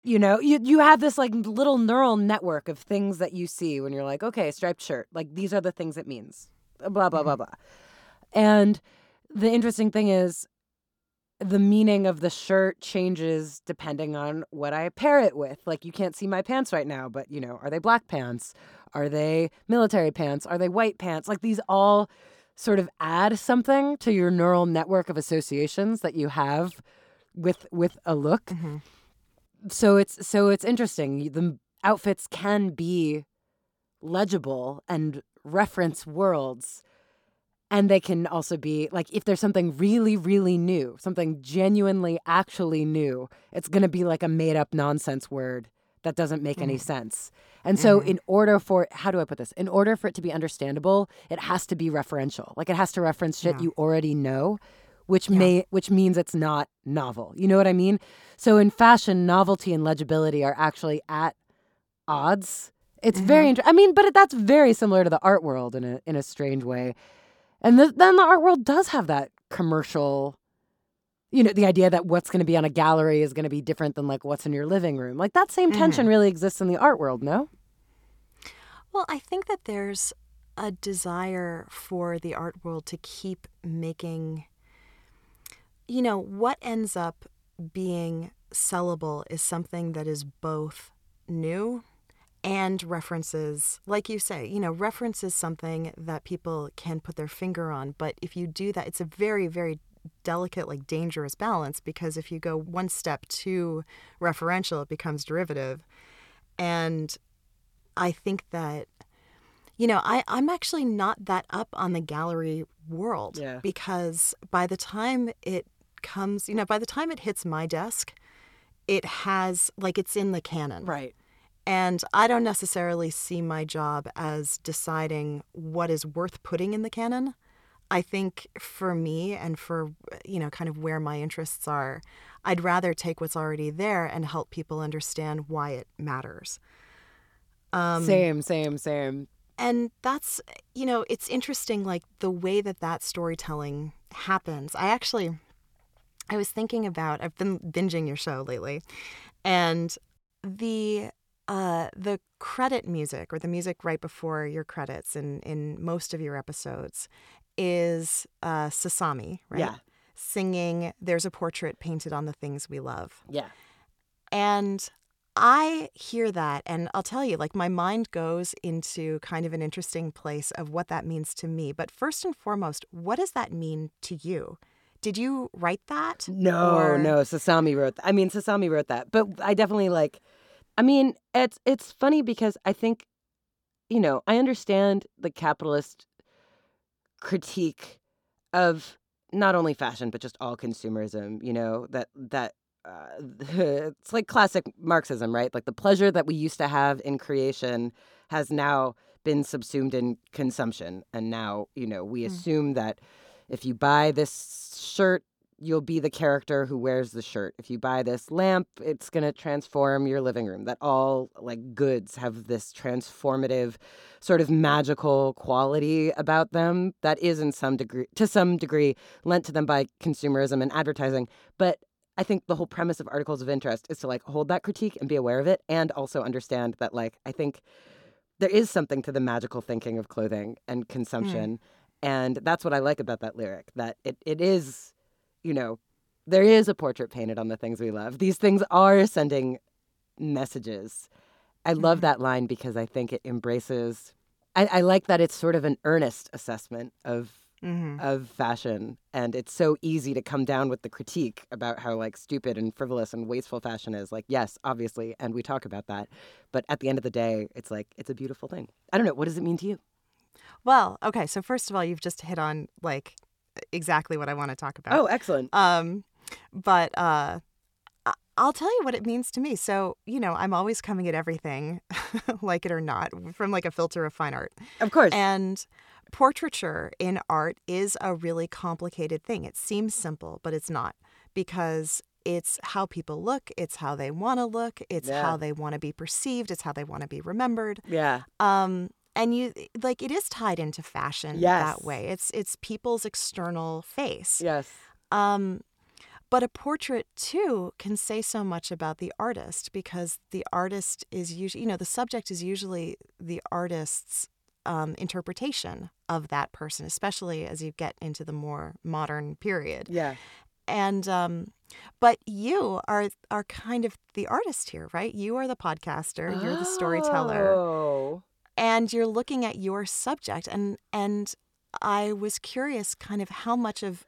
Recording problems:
none

